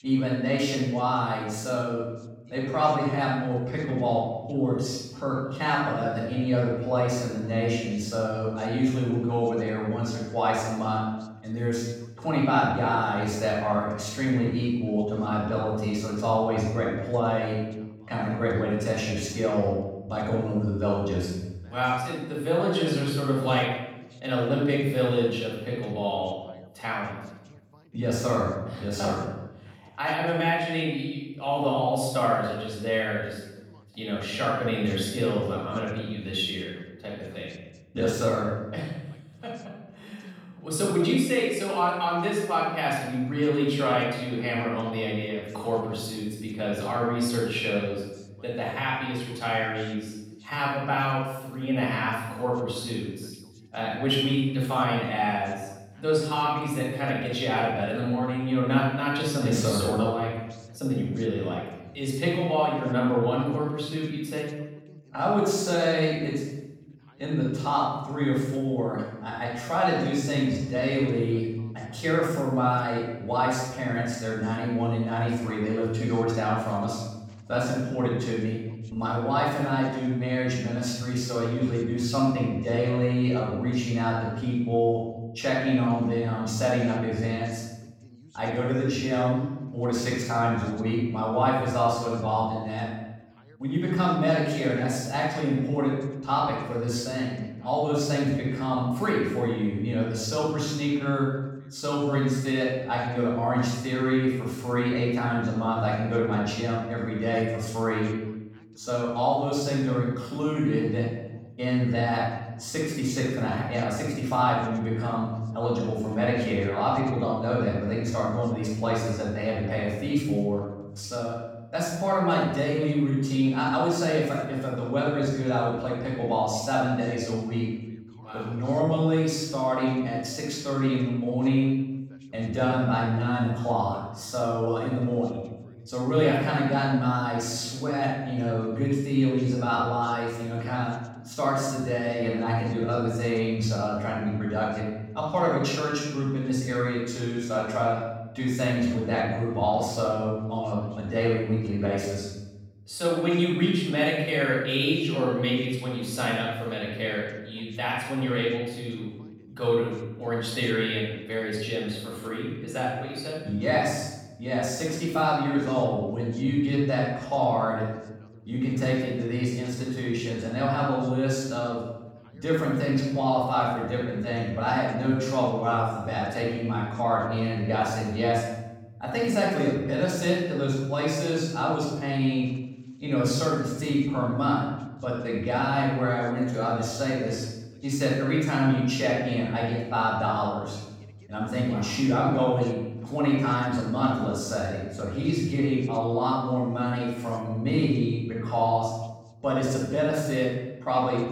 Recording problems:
room echo; strong; dies away in 0.9 s
off-mic speech; far
voice in the background; faint; throughout; 30 dB below the speech

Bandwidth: 17 kHz